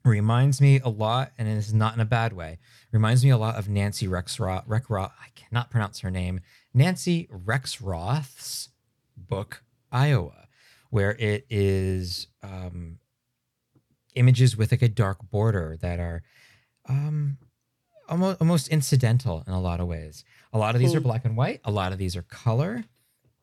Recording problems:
none

